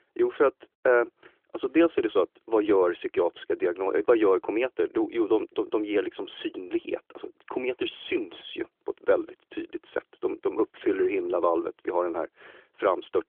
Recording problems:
phone-call audio; nothing above 3.5 kHz

